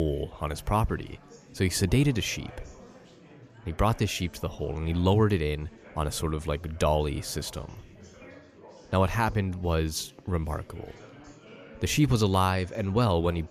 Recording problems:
chatter from many people; faint; throughout; 20 dB below the speech
abrupt cut into speech; at the start

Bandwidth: 14.5 kHz